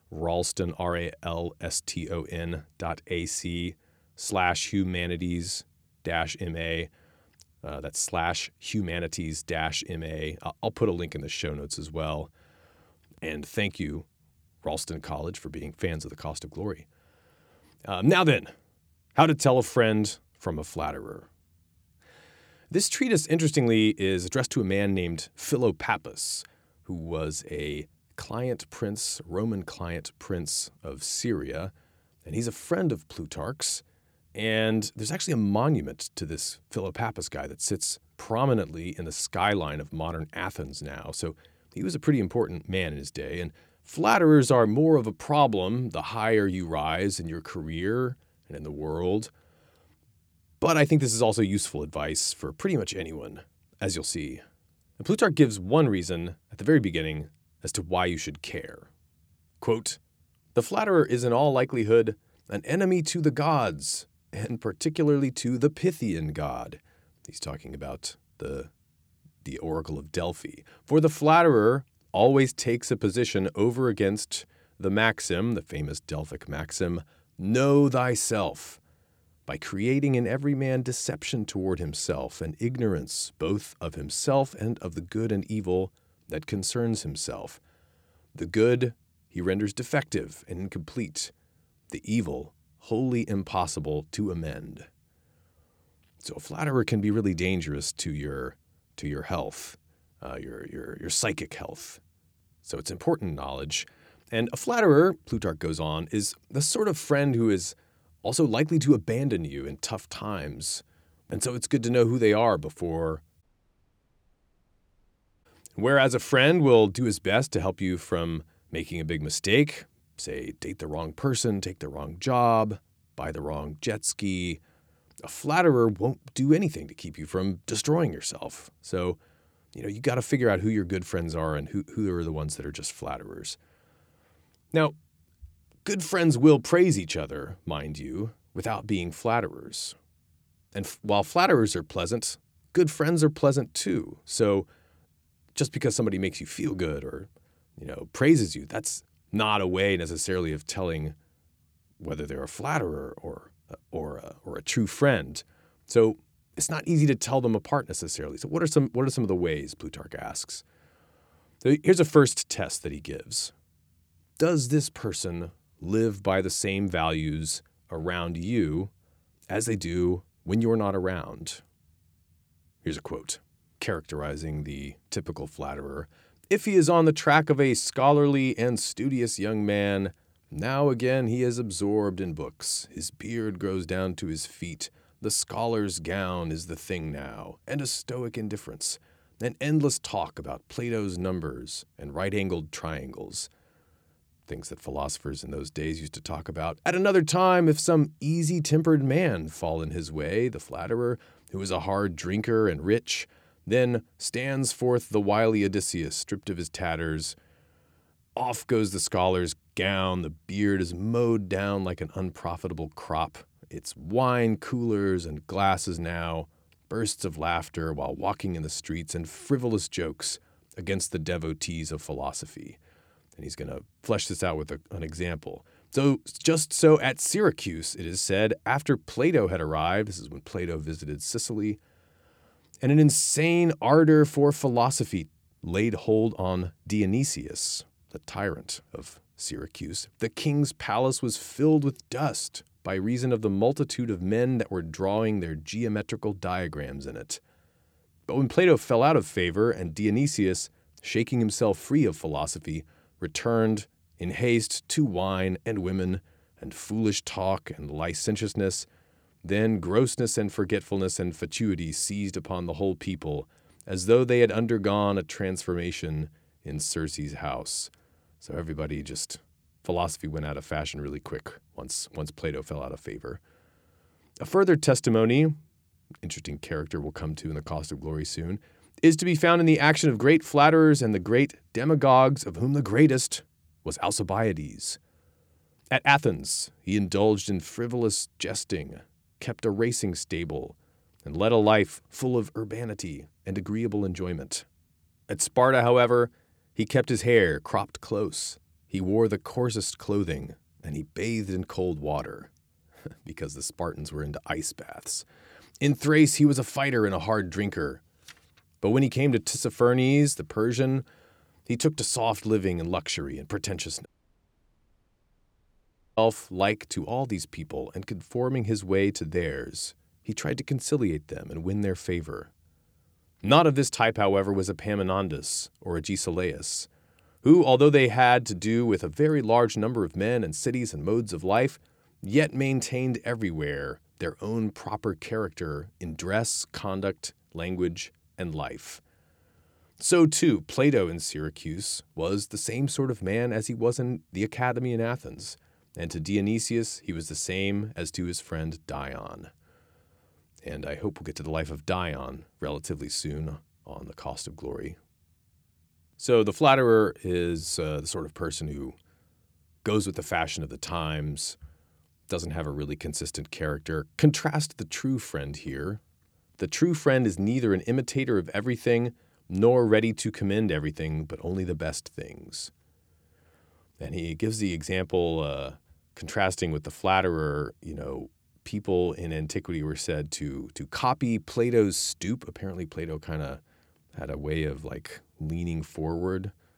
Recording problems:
audio cutting out; at 1:53 for 2 s and at 5:14 for 2 s

